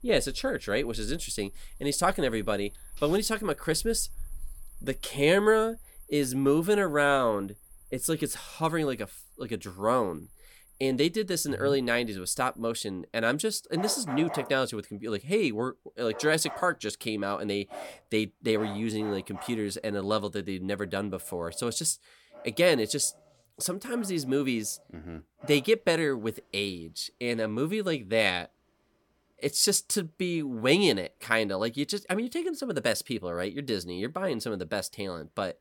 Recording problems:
animal sounds; noticeable; throughout; 20 dB below the speech

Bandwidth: 17.5 kHz